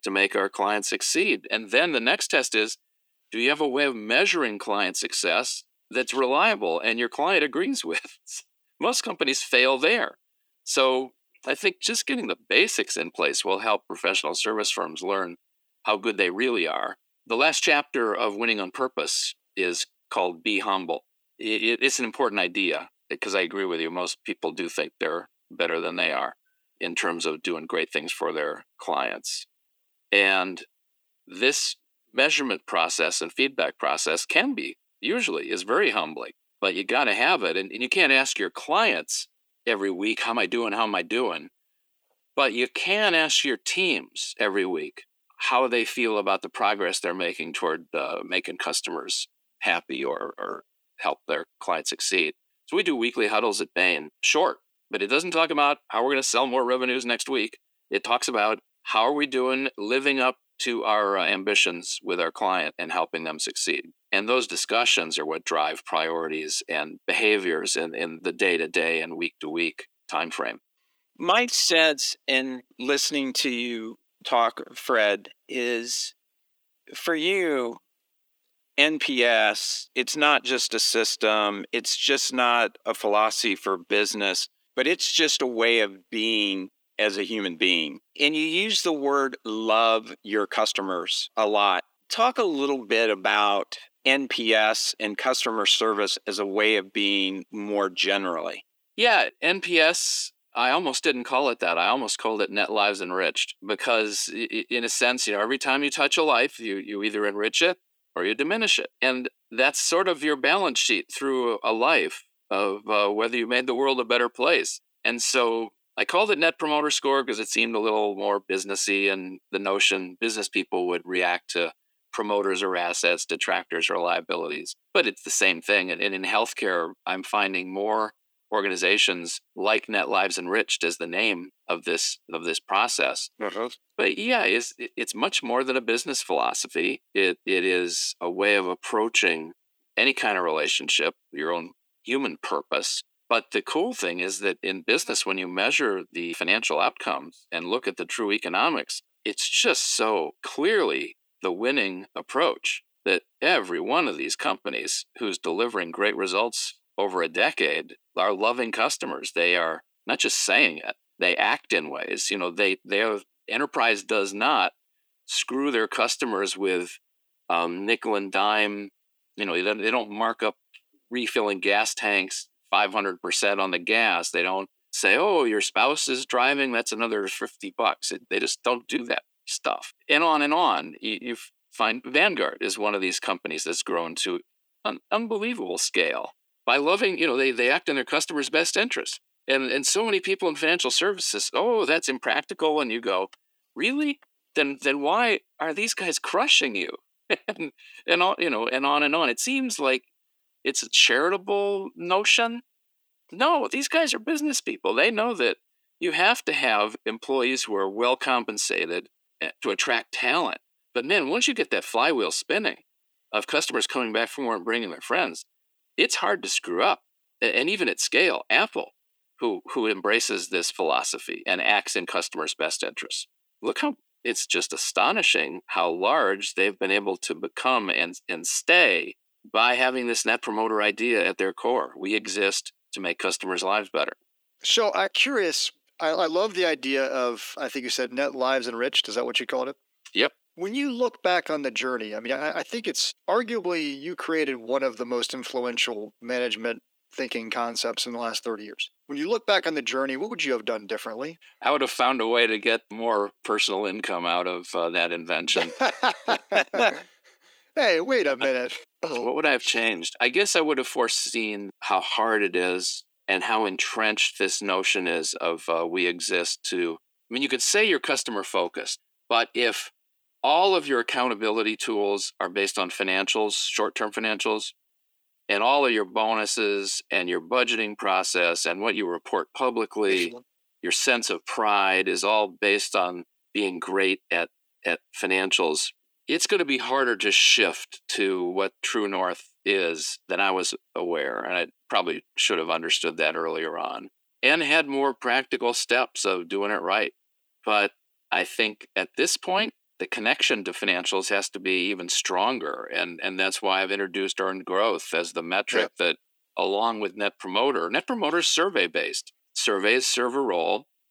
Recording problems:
thin; somewhat; fading below 300 Hz

